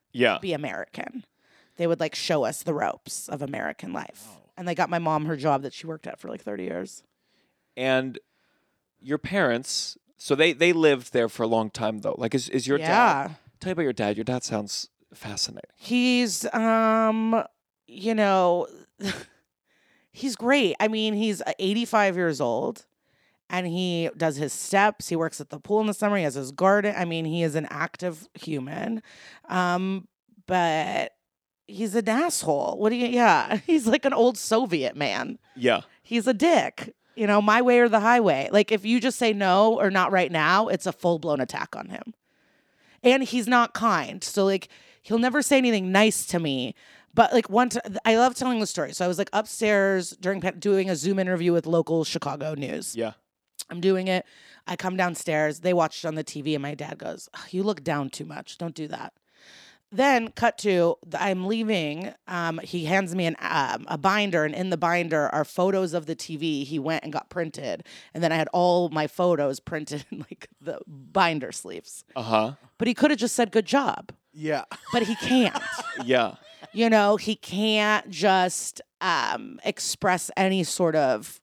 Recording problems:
uneven, jittery; strongly; from 20 s to 1:02

